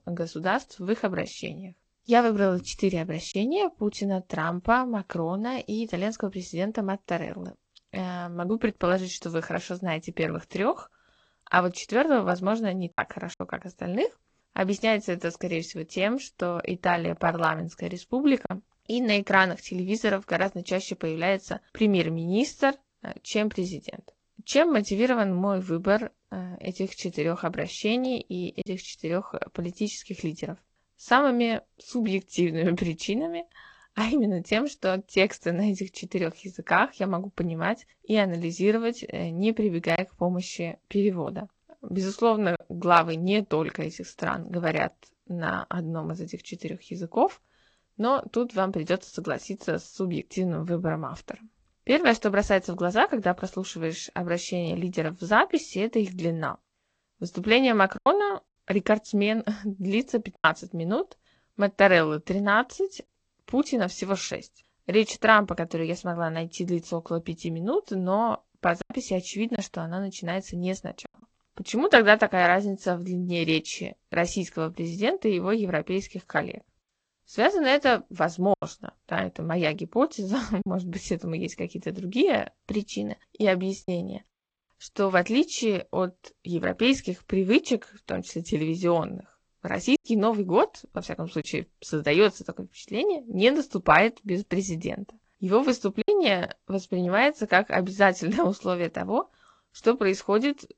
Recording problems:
garbled, watery; slightly; nothing above 7.5 kHz
choppy; occasionally; 1% of the speech affected

